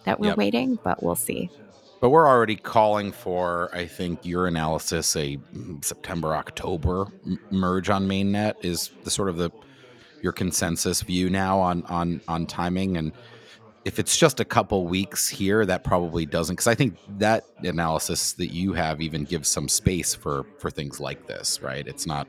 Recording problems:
background chatter; faint; throughout; 3 voices, 25 dB below the speech

